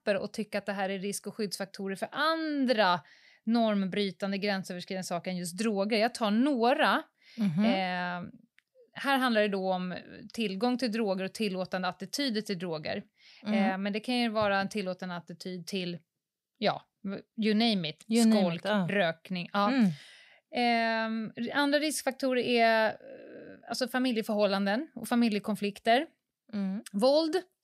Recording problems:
none

